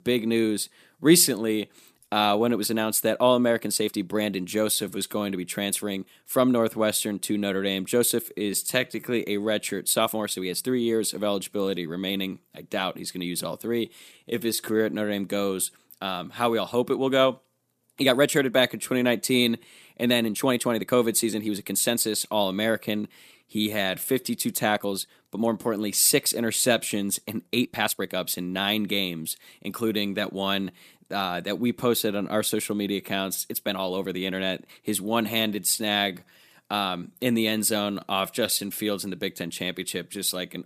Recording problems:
uneven, jittery; strongly; from 2 to 39 s

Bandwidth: 14.5 kHz